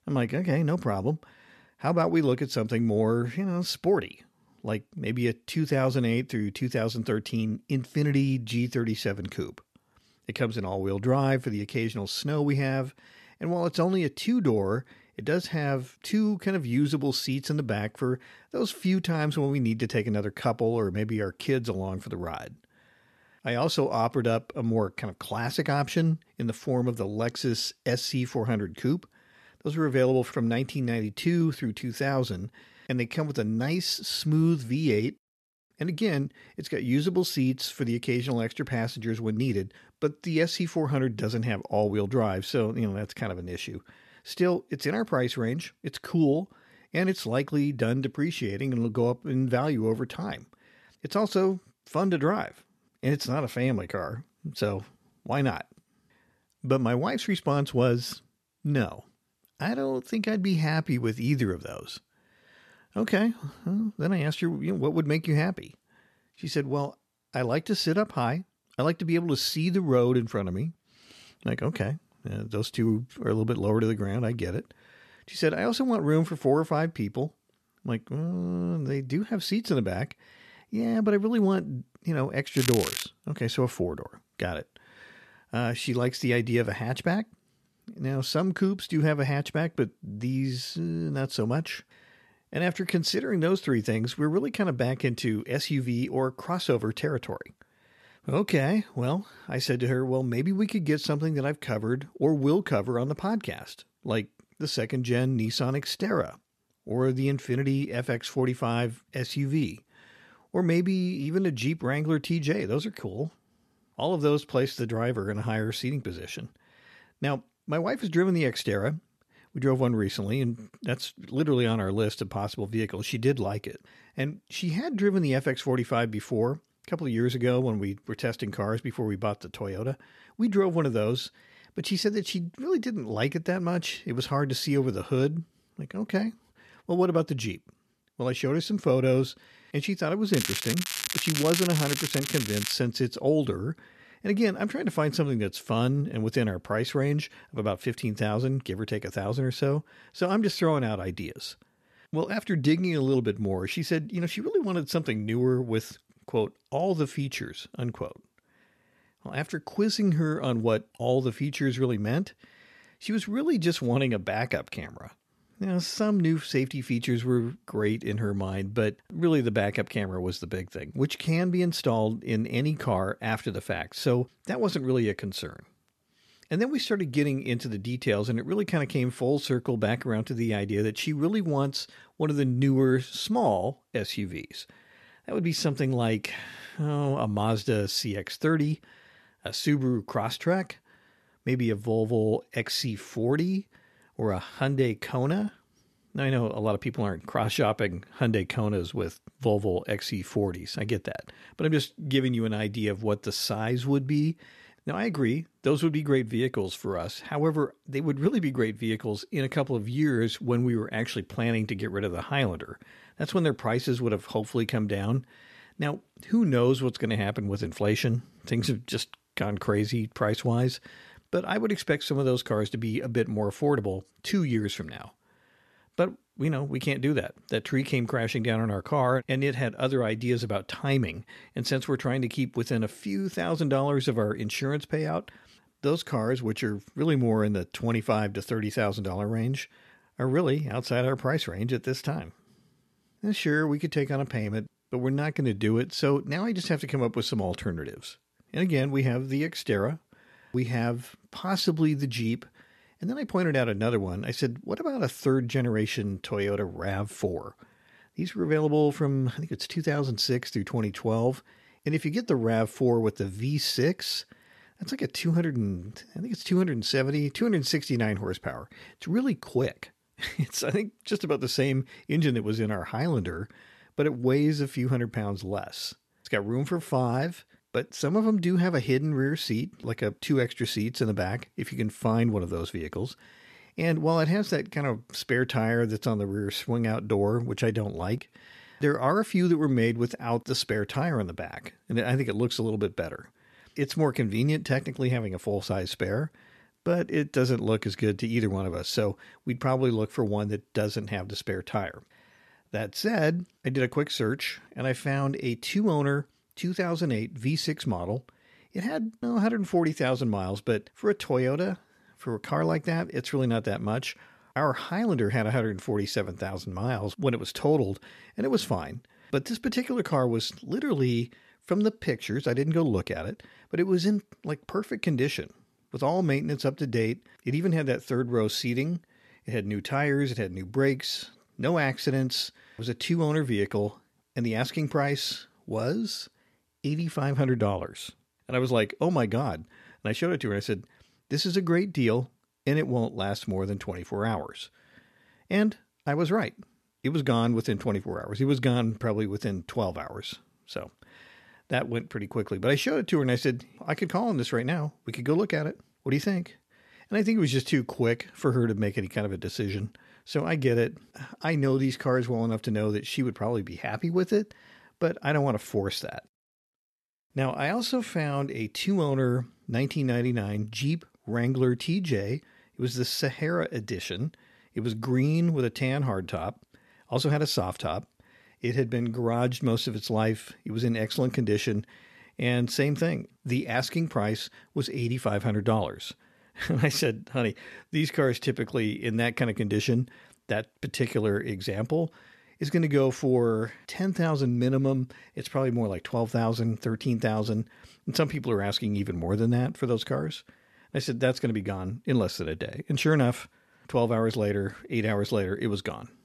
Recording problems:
crackling; loud; at 1:23 and from 2:20 to 2:23; 2 dB below the speech

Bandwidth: 13.5 kHz